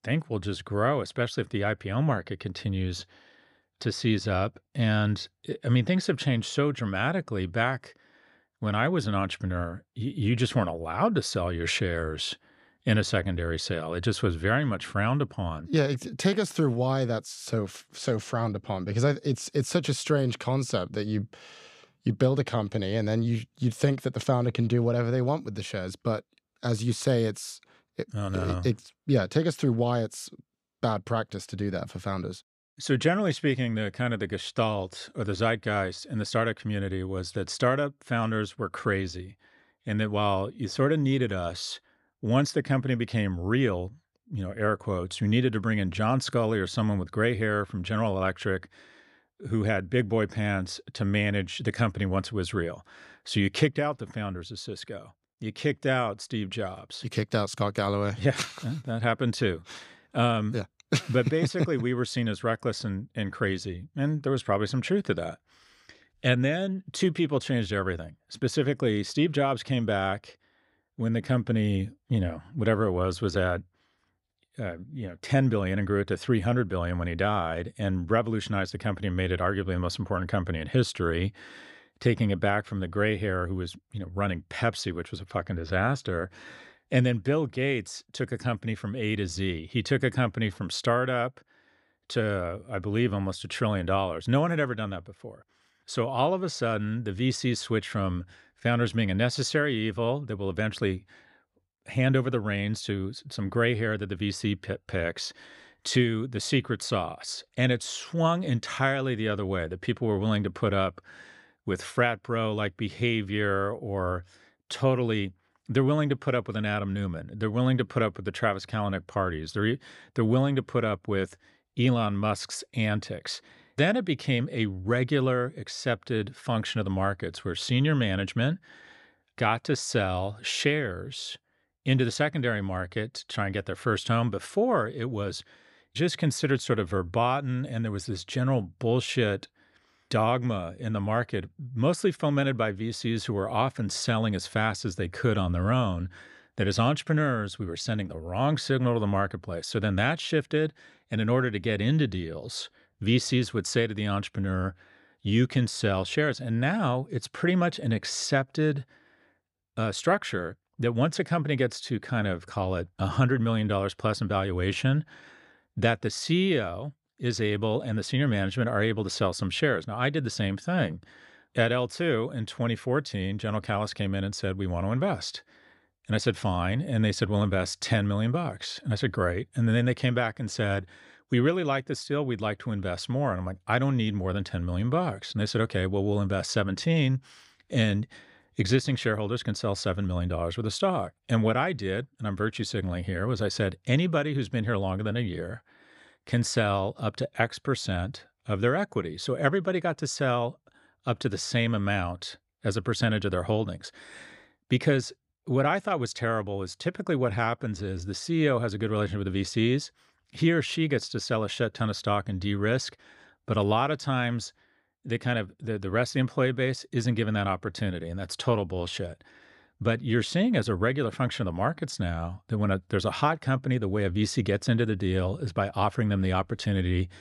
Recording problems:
none

